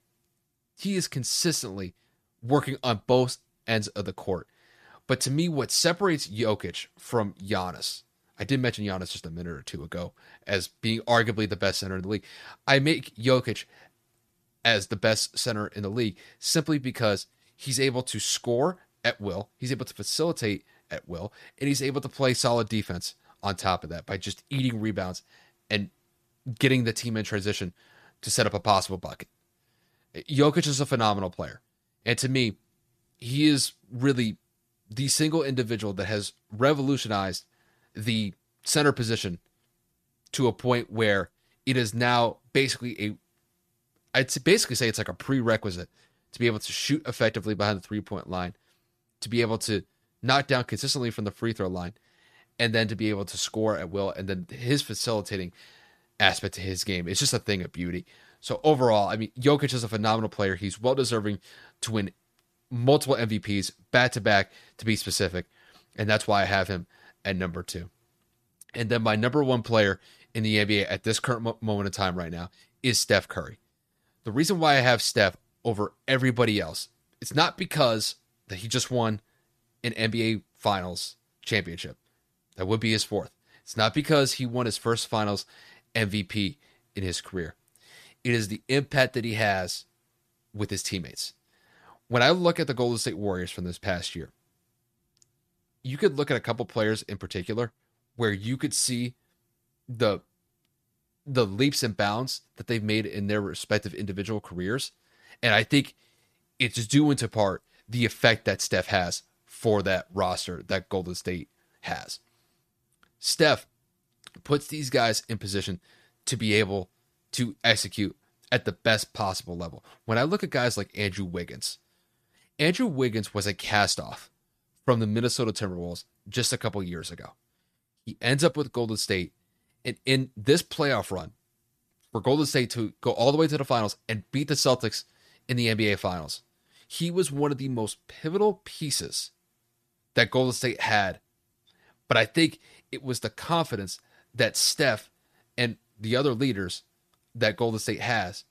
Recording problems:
none

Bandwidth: 14.5 kHz